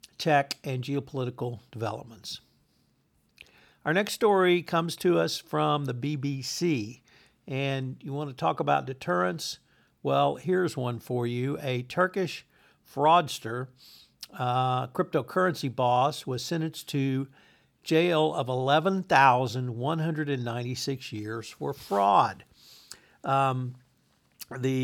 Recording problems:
abrupt cut into speech; at the end

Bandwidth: 18.5 kHz